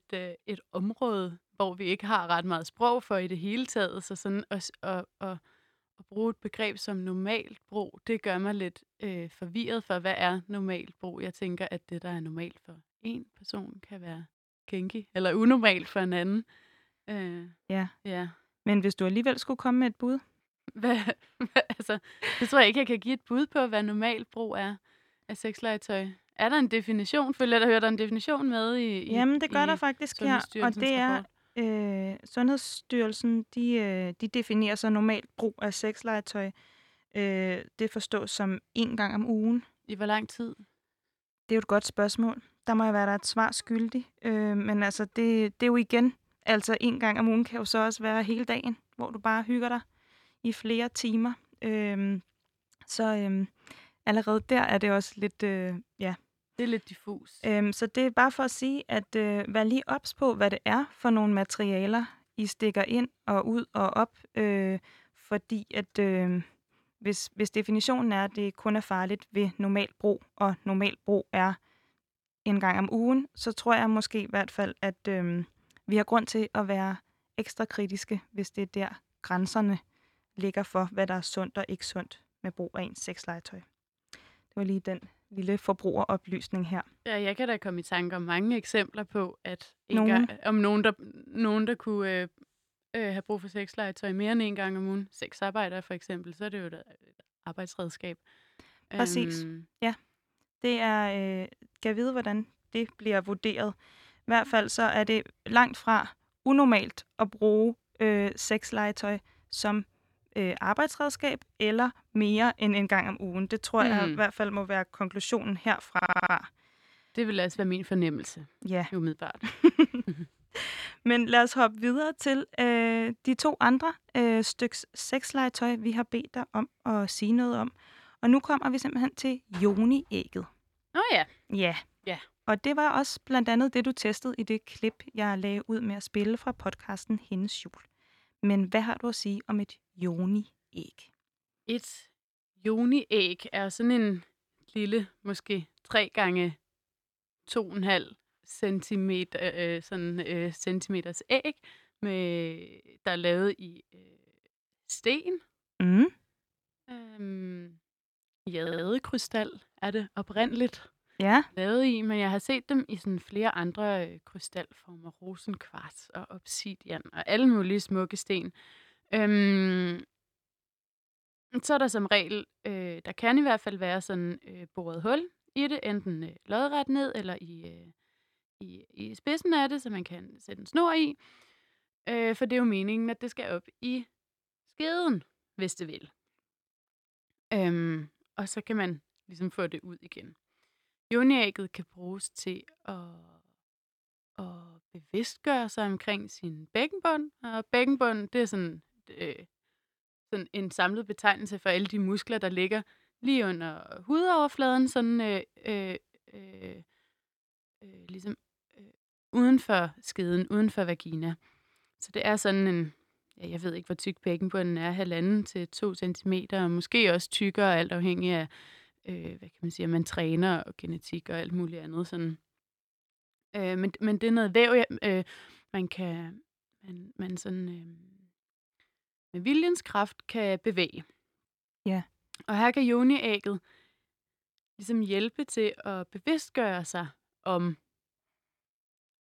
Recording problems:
audio stuttering; at 1:56 and at 2:39

